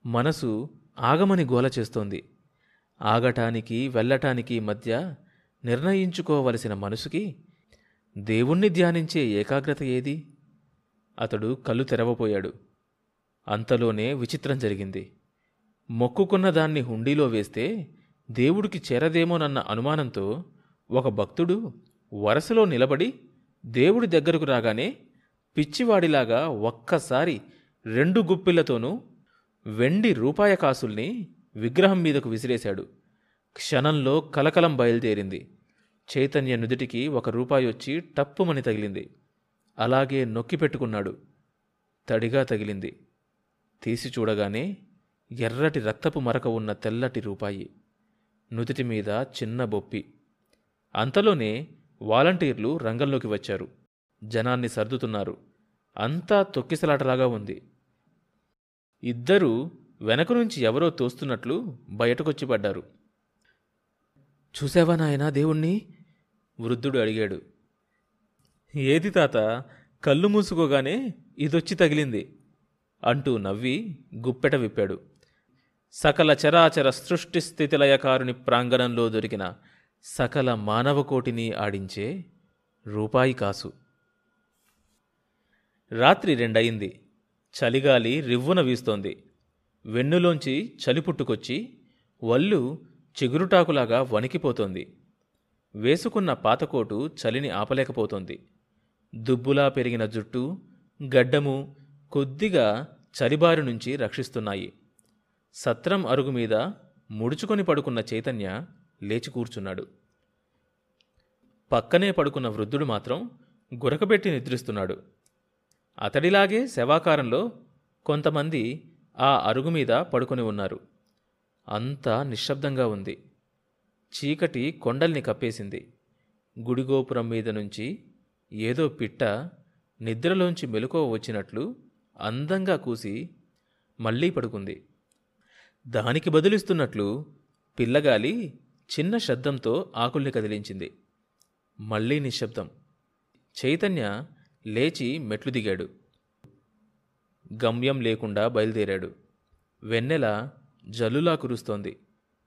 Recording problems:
none

